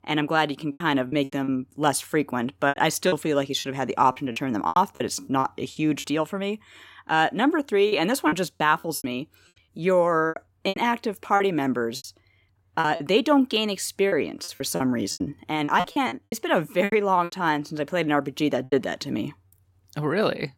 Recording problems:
choppy; very; 11% of the speech affected

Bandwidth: 16.5 kHz